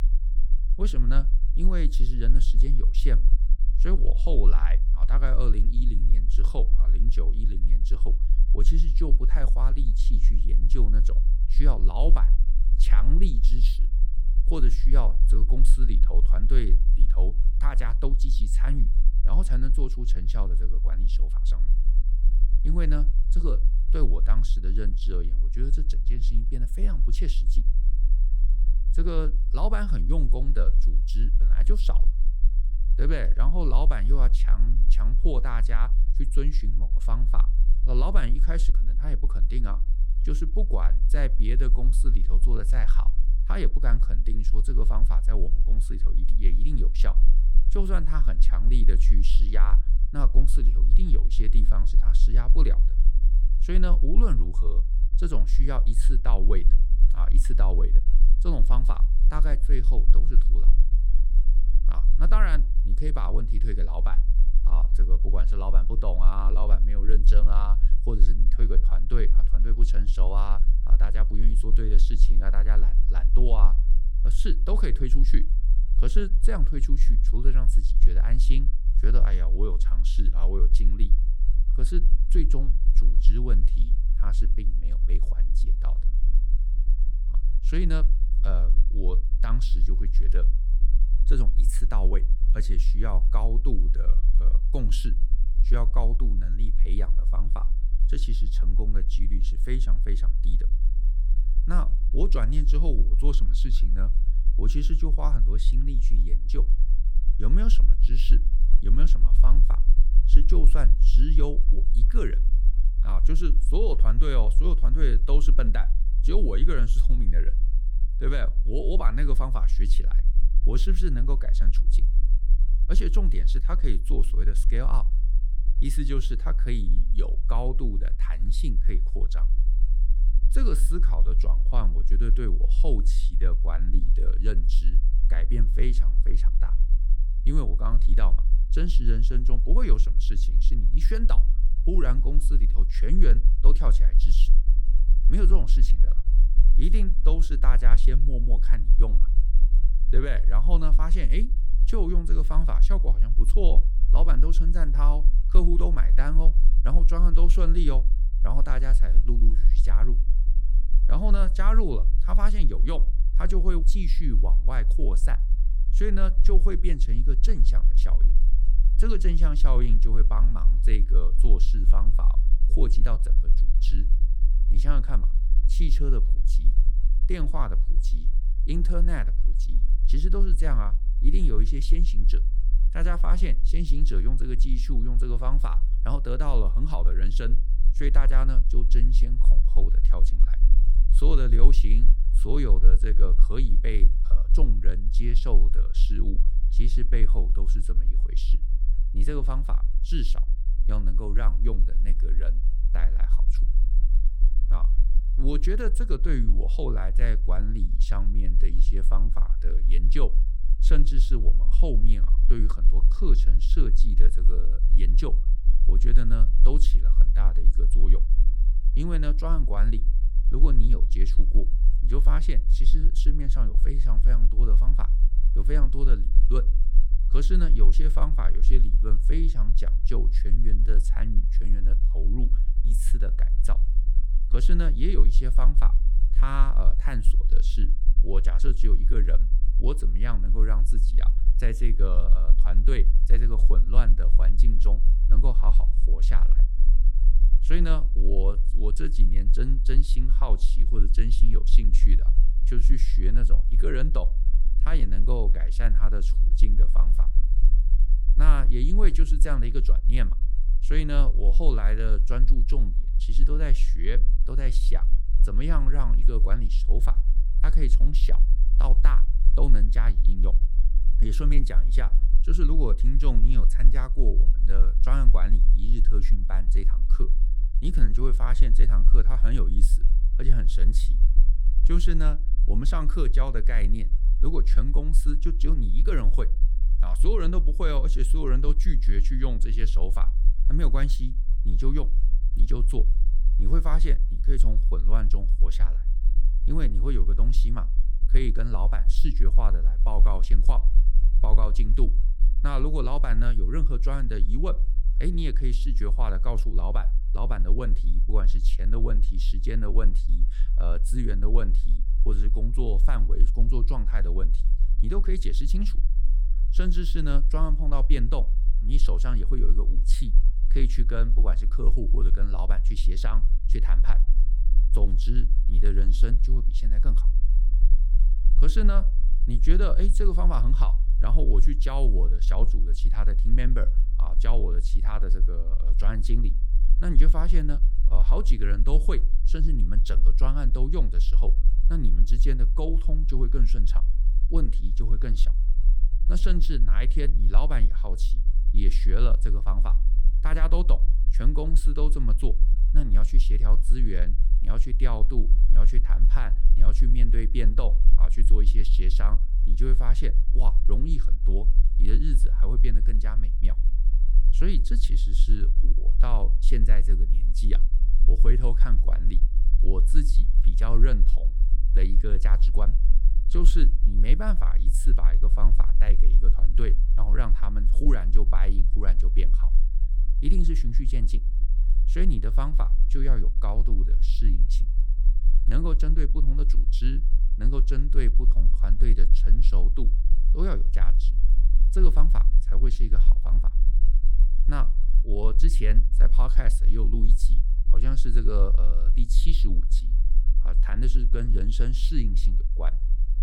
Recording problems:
low rumble; noticeable; throughout; 15 dB below the speech

